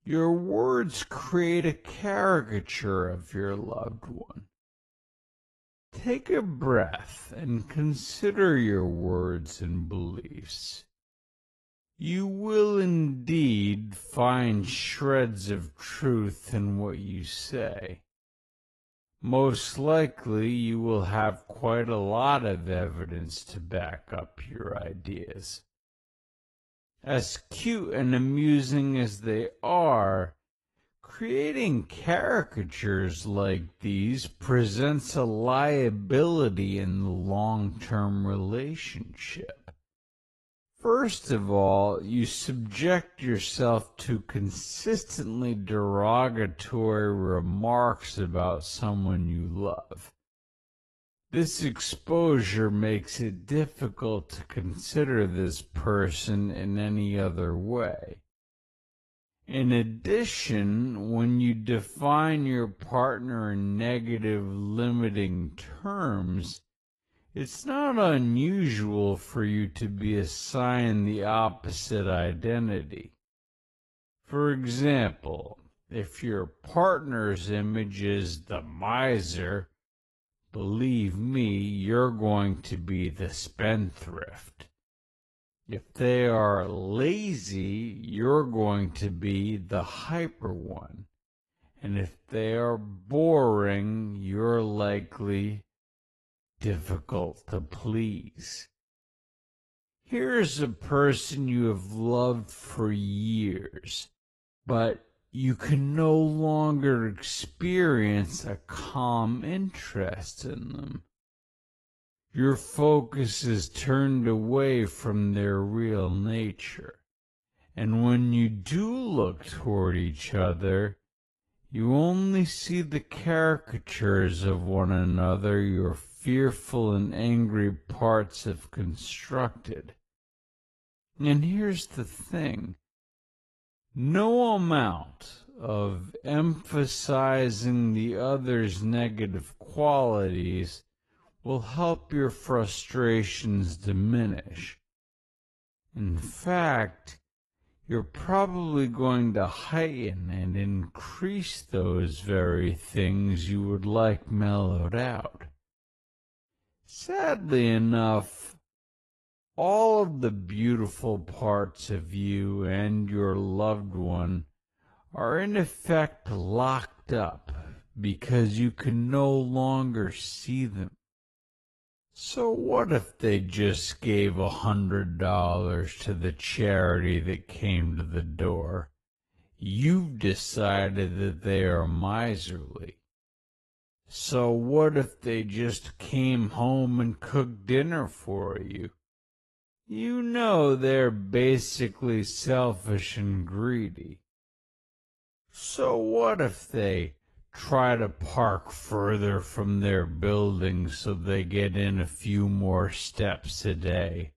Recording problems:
wrong speed, natural pitch; too slow; 0.5 times normal speed
garbled, watery; slightly; nothing above 11.5 kHz

